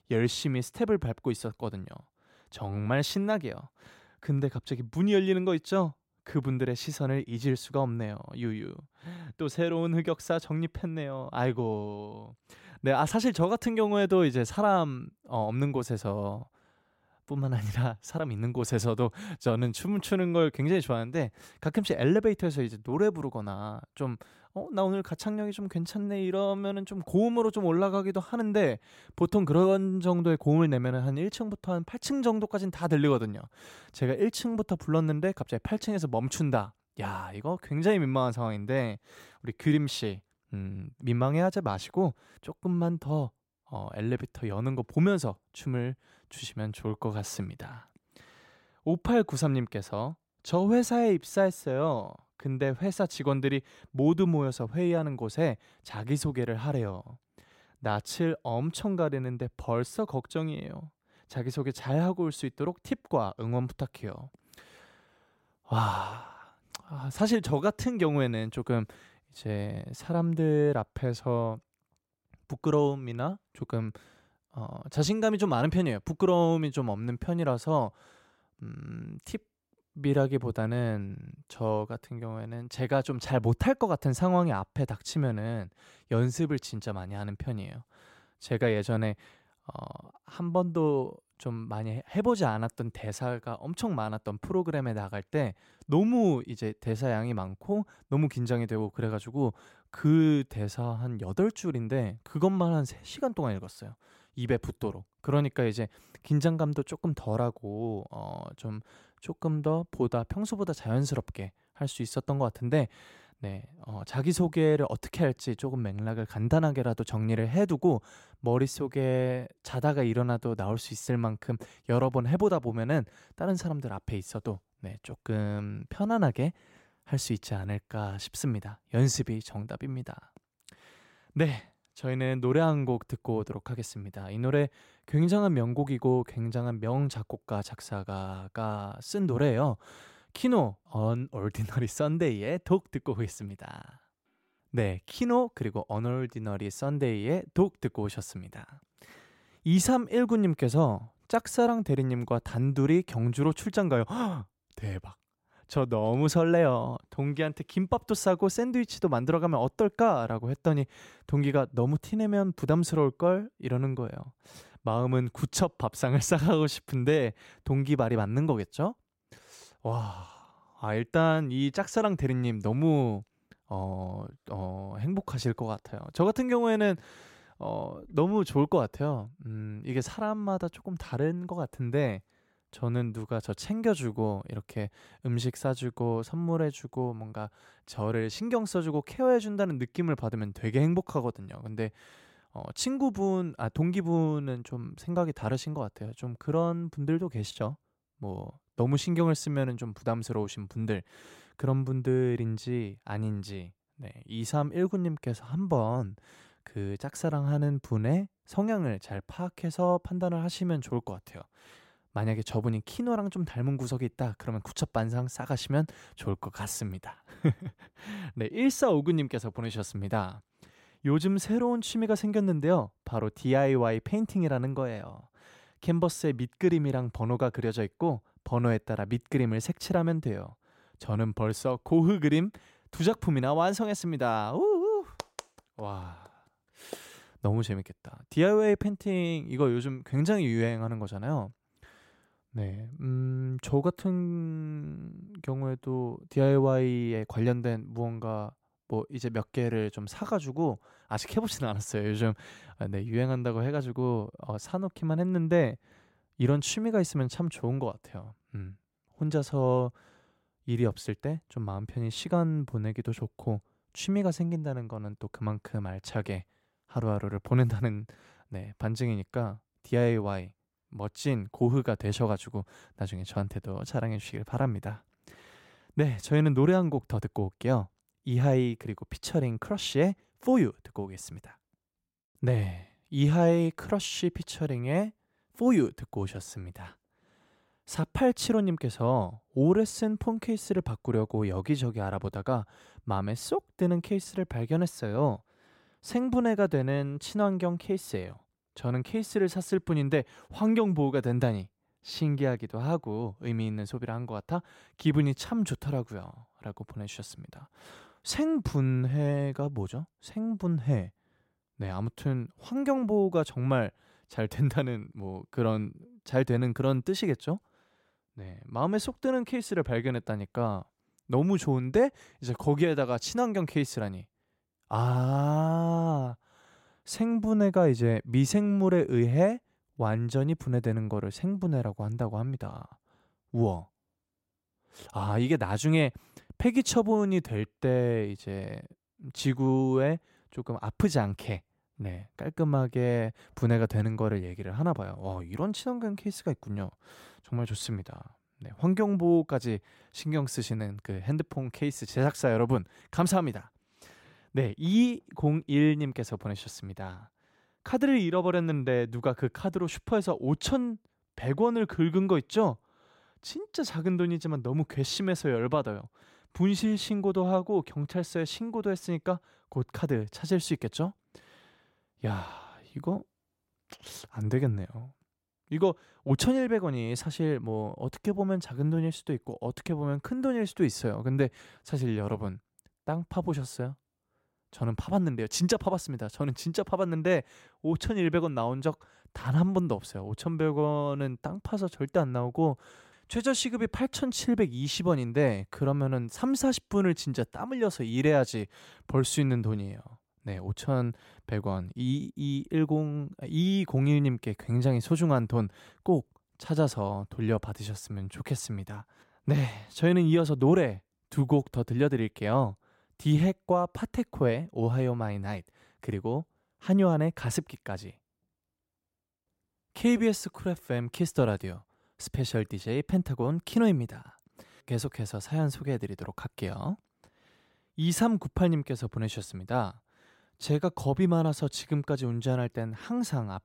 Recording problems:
none

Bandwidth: 16 kHz